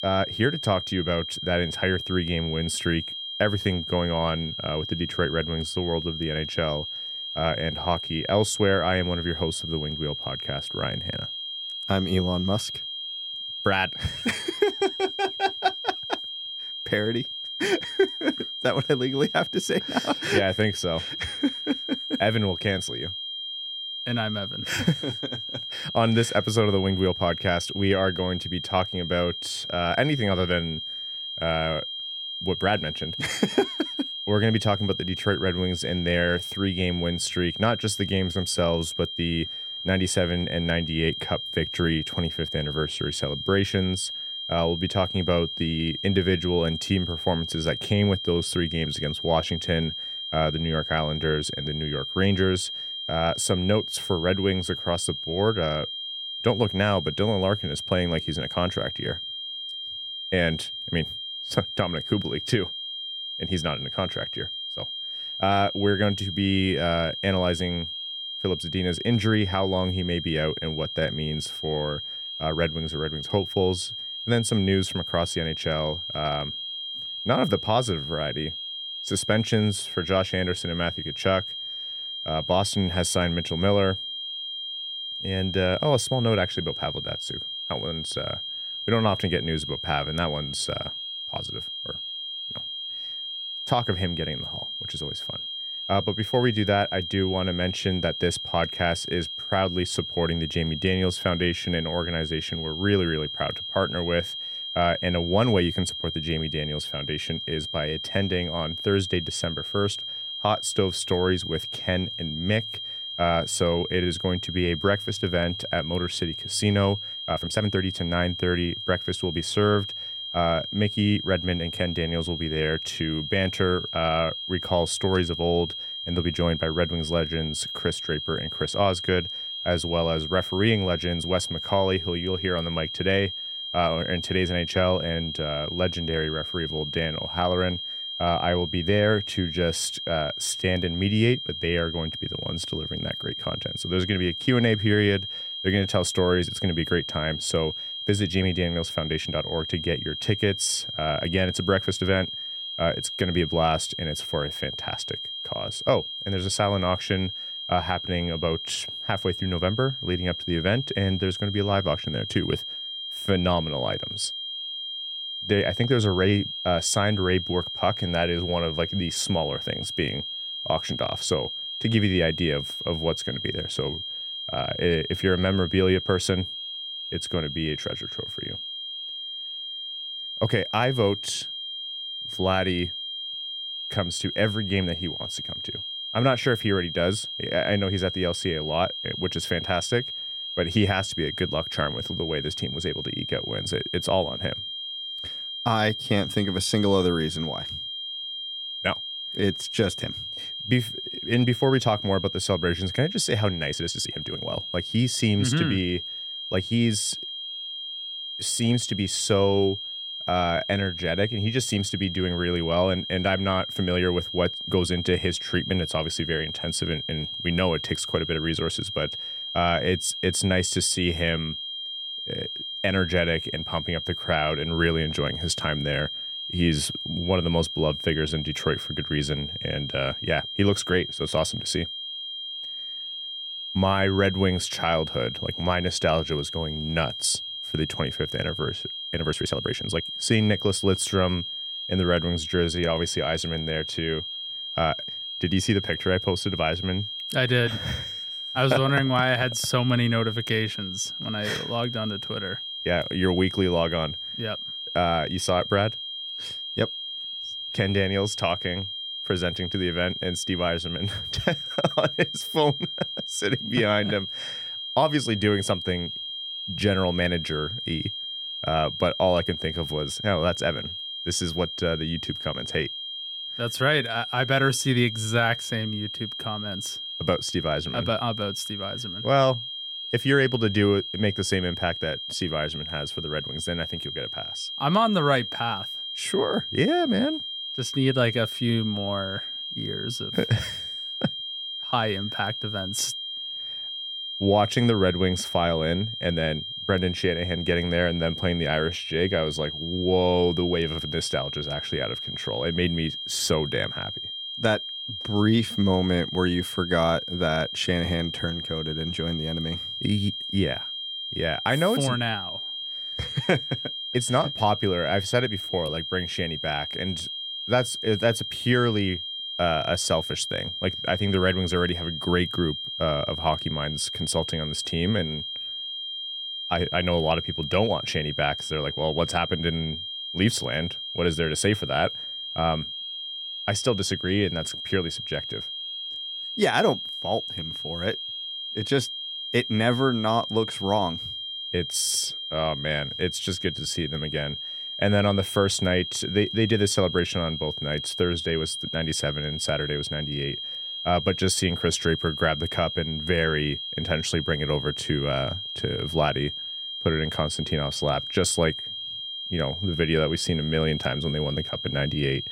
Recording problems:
high-pitched whine; loud; throughout; 3 kHz, 5 dB below the speech
uneven, jittery; strongly; from 14 s to 5:44

